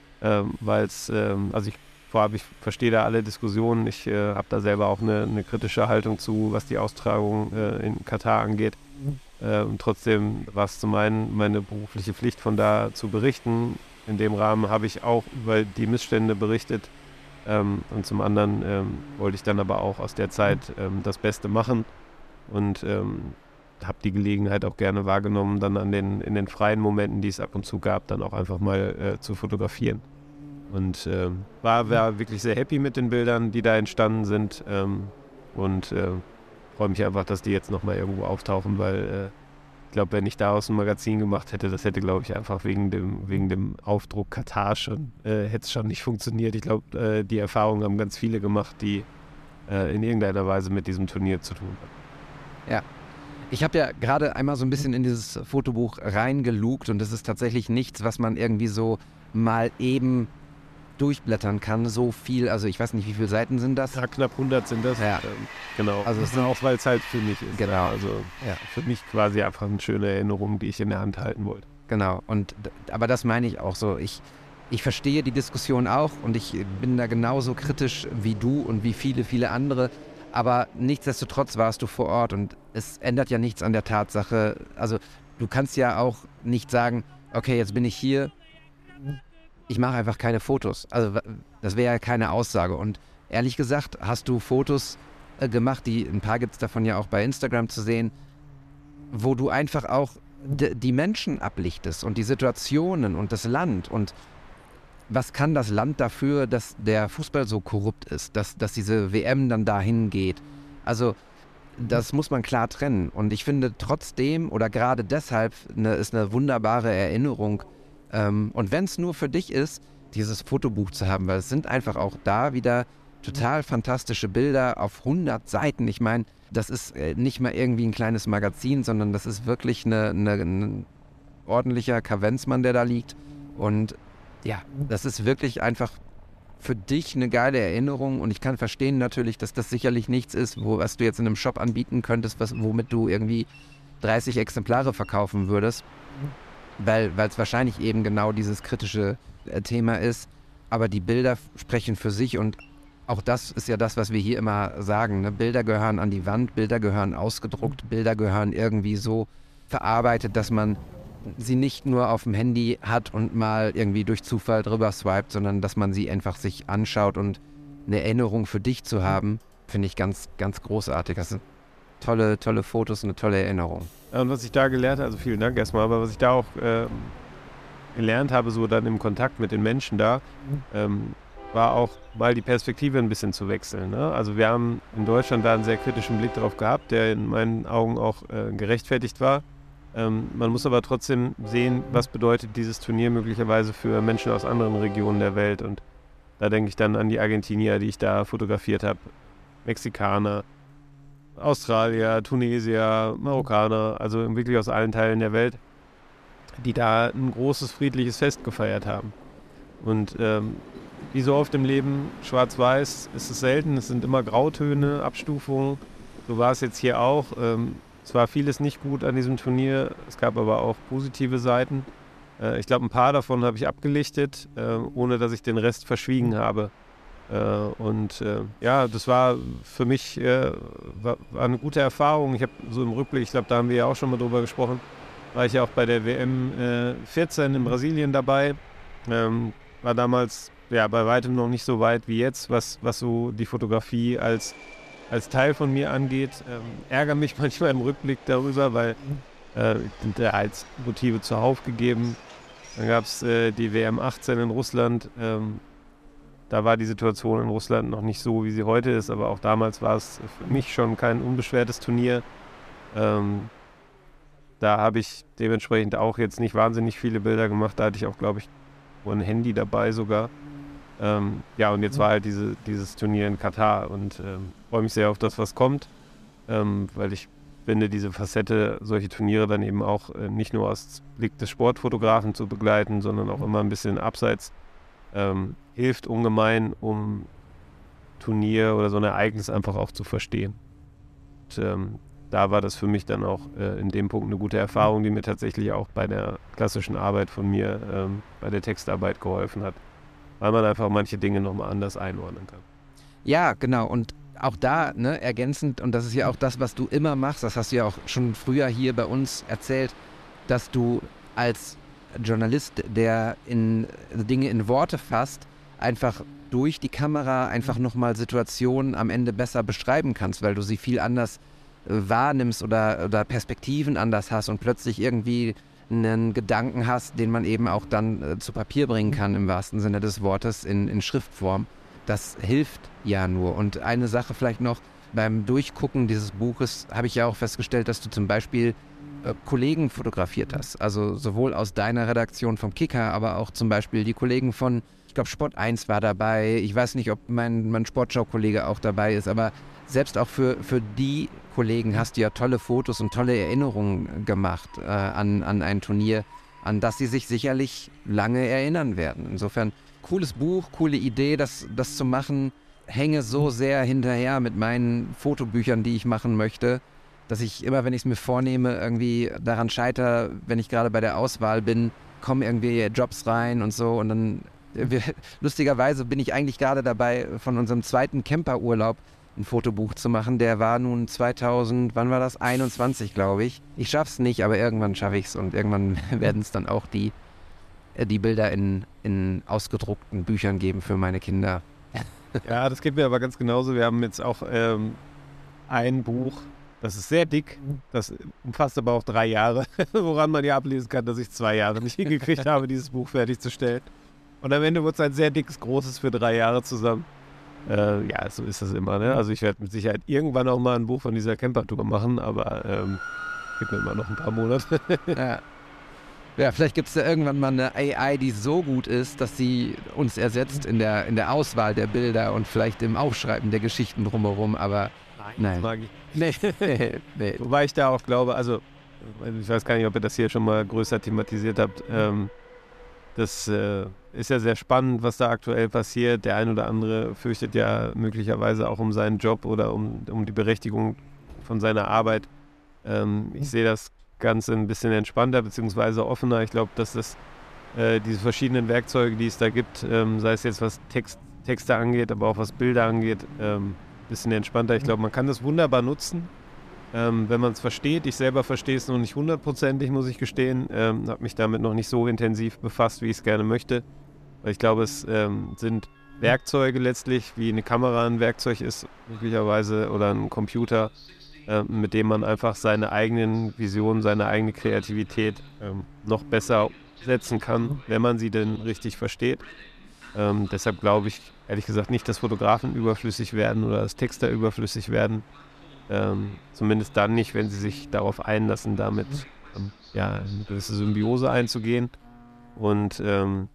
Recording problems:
electrical hum; faint; throughout; 60 Hz, 30 dB below the speech
train or aircraft noise; faint; throughout; 20 dB below the speech

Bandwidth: 14.5 kHz